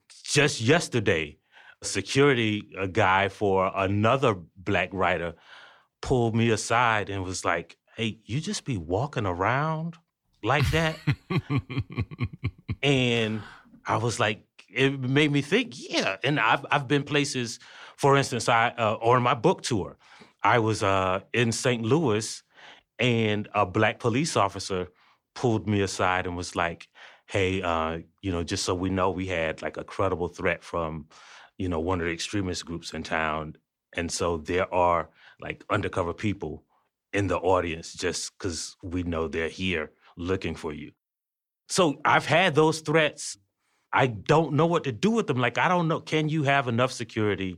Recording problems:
none

